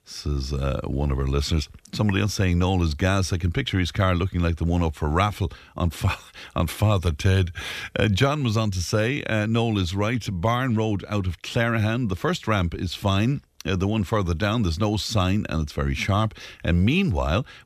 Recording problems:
none

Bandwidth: 14.5 kHz